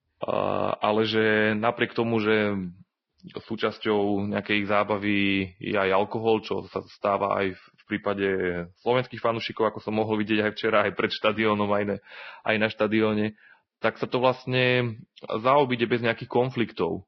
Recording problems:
garbled, watery; badly; nothing above 5.5 kHz

